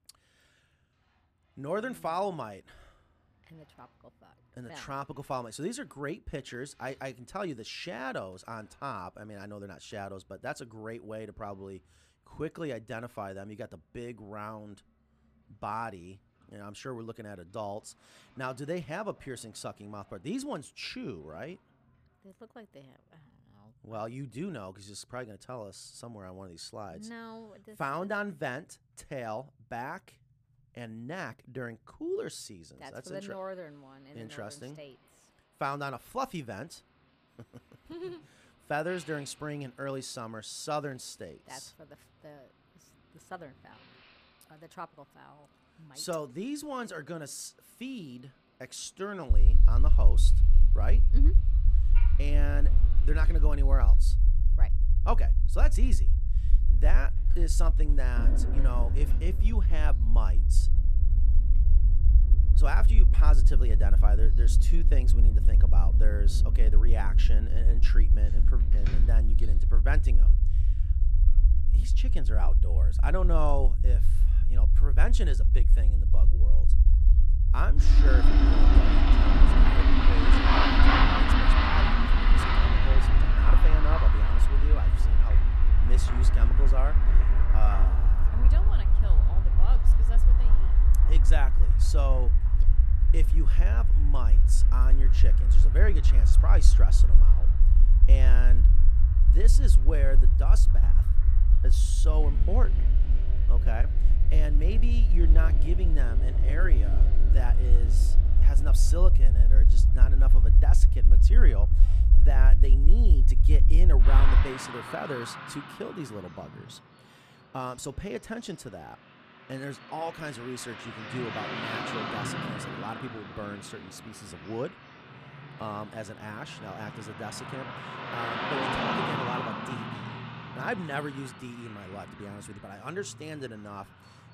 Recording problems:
traffic noise; very loud; throughout; 3 dB above the speech
low rumble; loud; from 49 s to 1:54; 8 dB below the speech

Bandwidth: 14.5 kHz